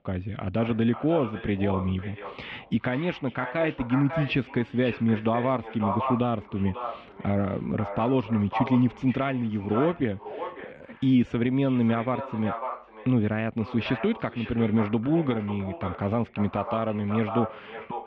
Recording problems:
echo of what is said; strong; throughout; 540 ms later, 10 dB below the speech
muffled; very; fading above 3 kHz

